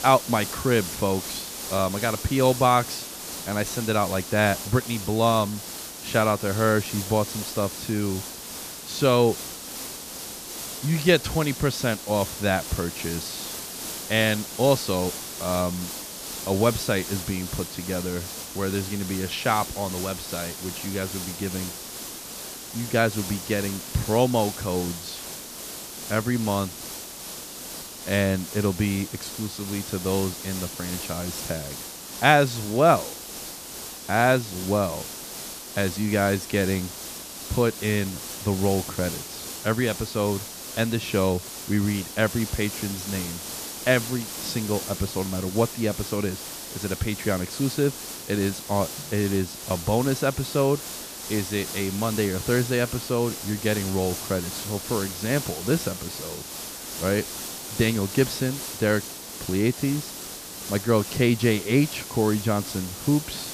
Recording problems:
hiss; loud; throughout; 8 dB below the speech

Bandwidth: 14.5 kHz